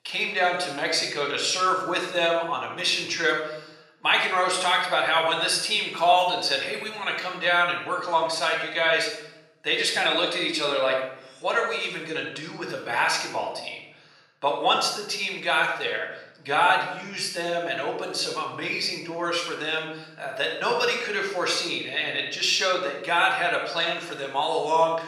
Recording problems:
room echo; noticeable; dies away in 1 s
thin; somewhat; fading below 500 Hz
off-mic speech; somewhat distant

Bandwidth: 15 kHz